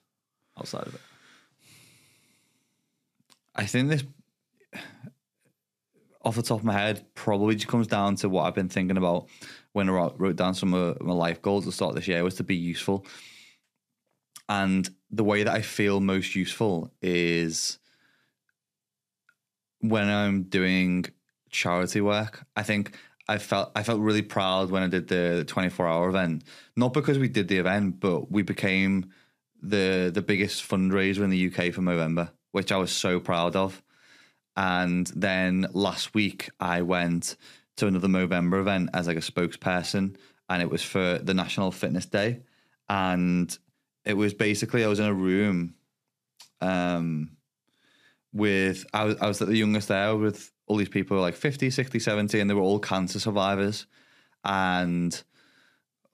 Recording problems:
none

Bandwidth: 14.5 kHz